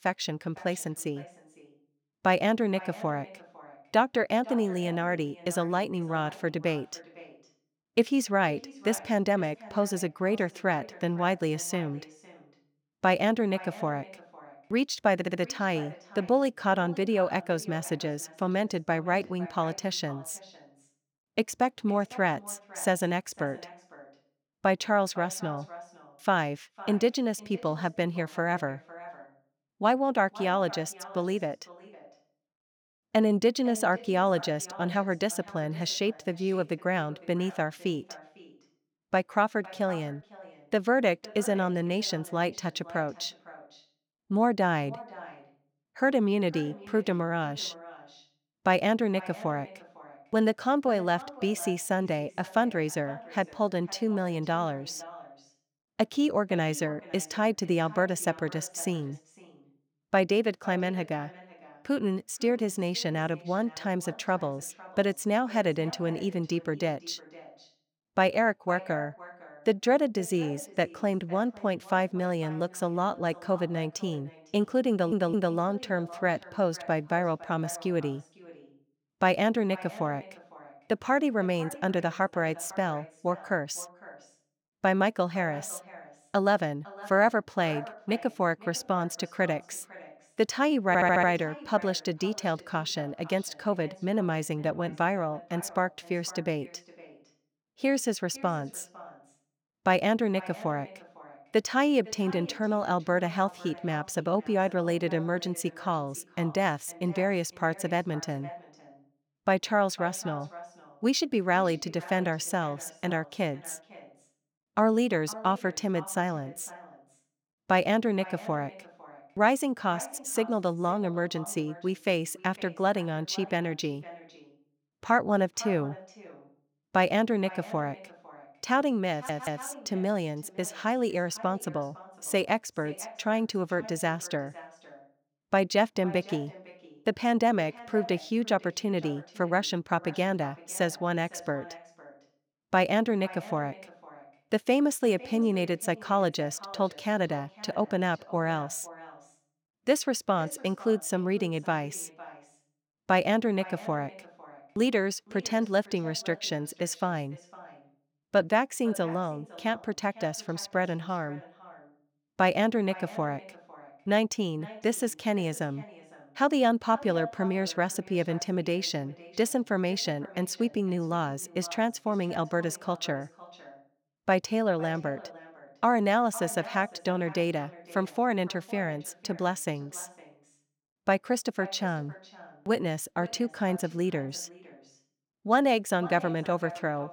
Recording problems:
echo of what is said; faint; throughout; 500 ms later, 20 dB below the speech
audio stuttering; 4 times, first at 15 s

